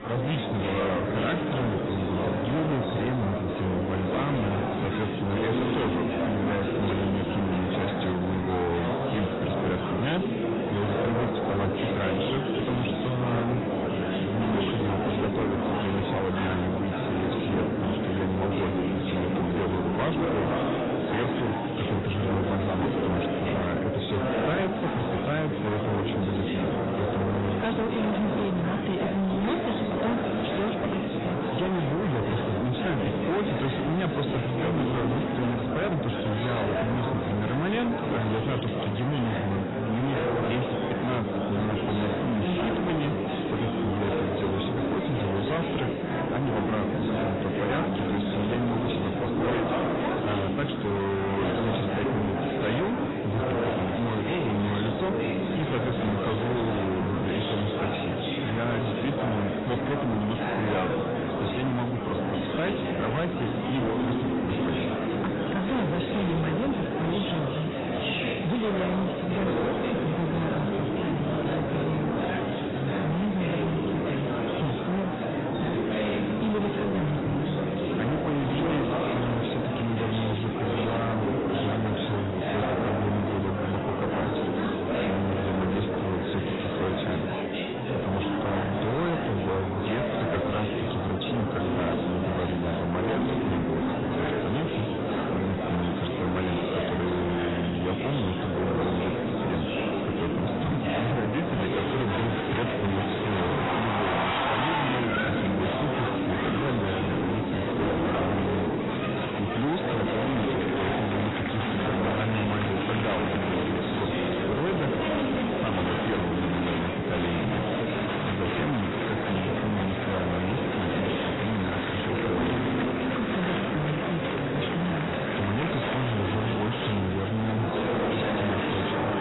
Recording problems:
distortion; heavy; 33% of the sound clipped
garbled, watery; badly; nothing above 4 kHz
murmuring crowd; very loud; throughout; 1 dB above the speech

